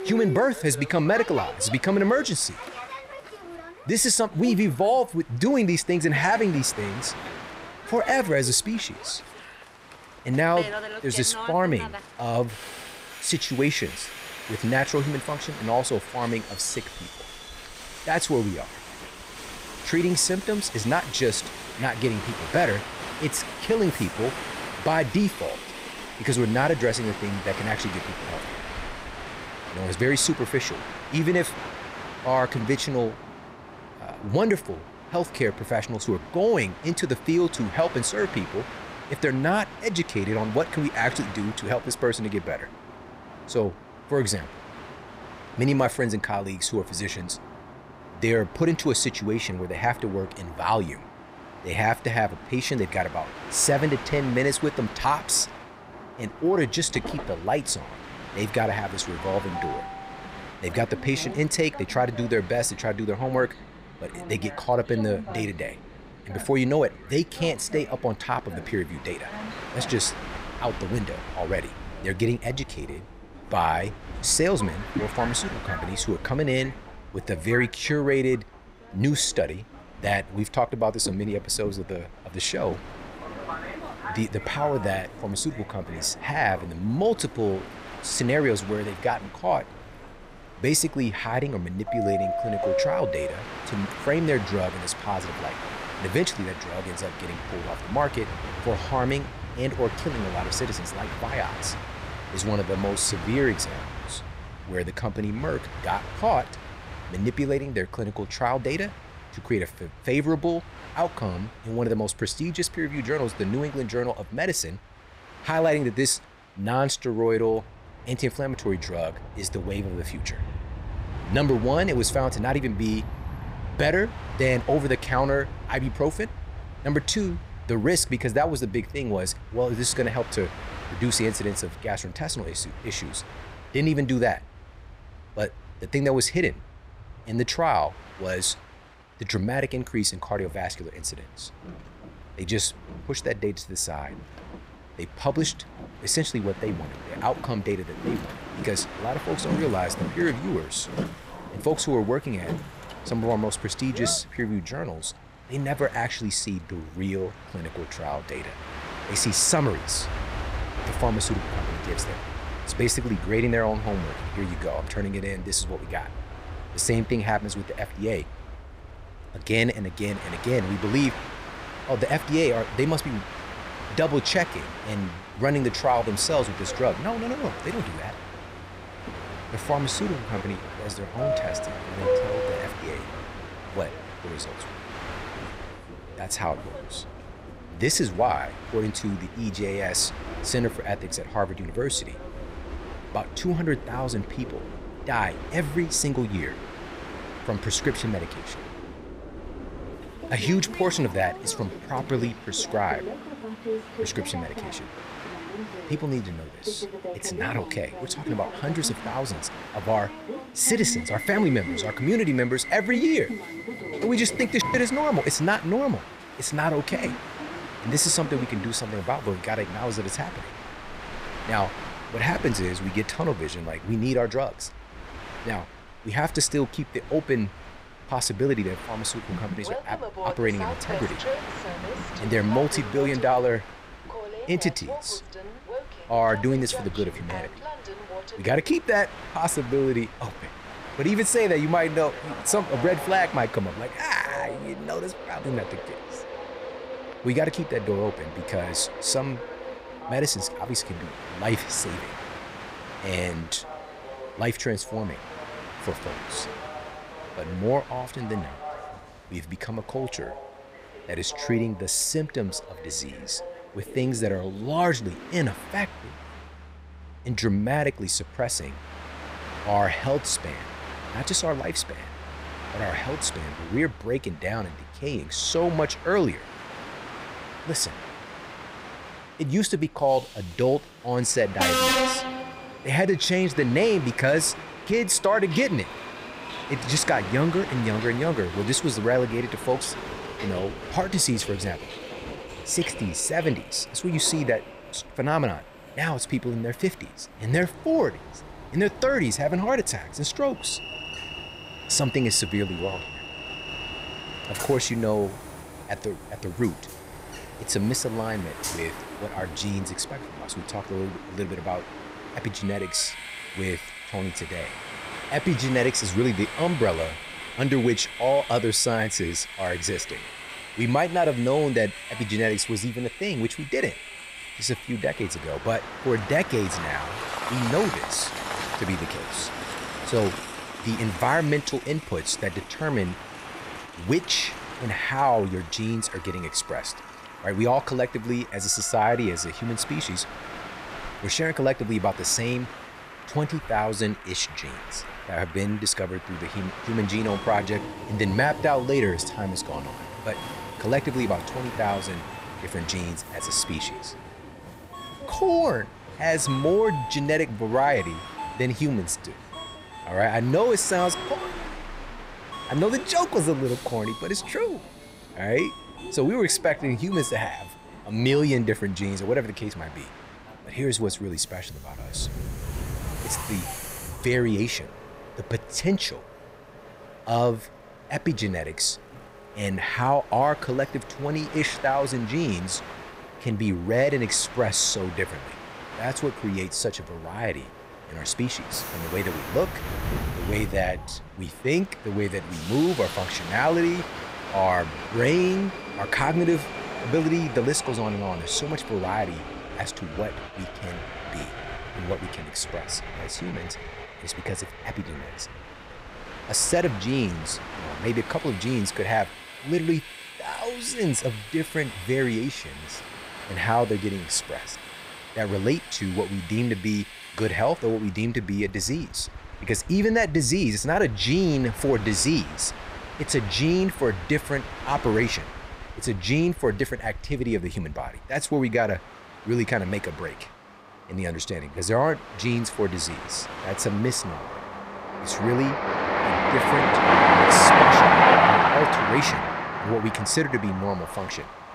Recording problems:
train or aircraft noise; loud; throughout; 7 dB below the speech

